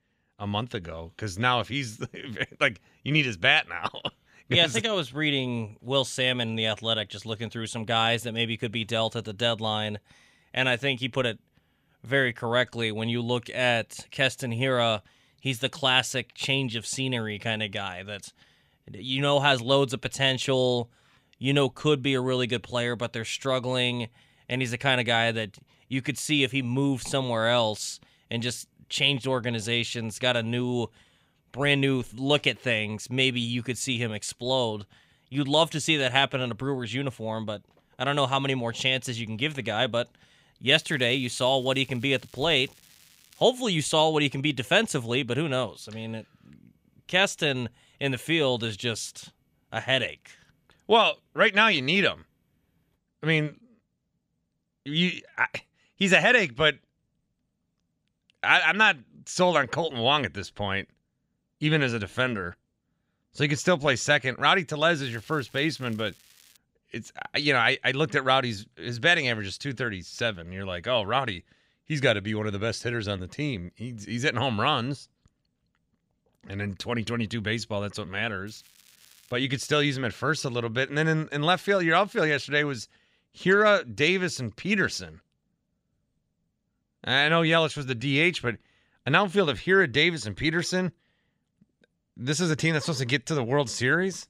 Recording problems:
crackling; faint; from 41 to 43 s, from 1:05 to 1:07 and at 1:18; 30 dB below the speech

